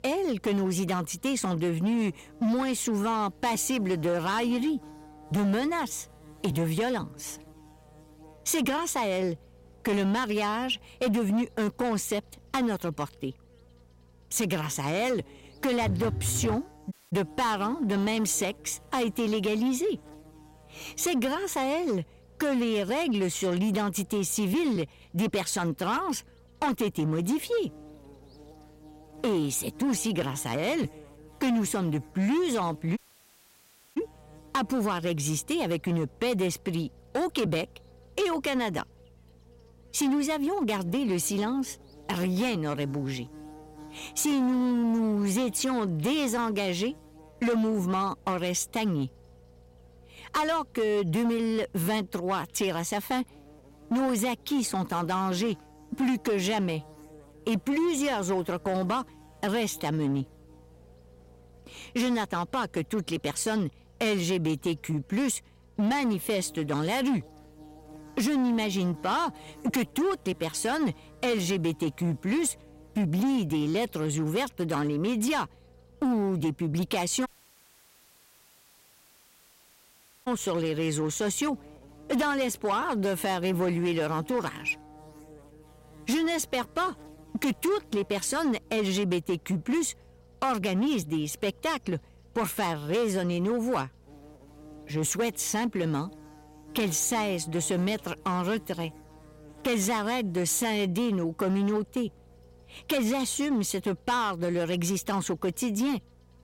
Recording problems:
distortion; slight; 11% of the sound clipped
electrical hum; faint; throughout; 60 Hz, 25 dB below the speech
phone ringing; noticeable; at 16 s; peak 3 dB below the speech
audio cutting out; at 17 s, at 33 s for 1 s and at 1:17 for 3 s

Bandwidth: 16 kHz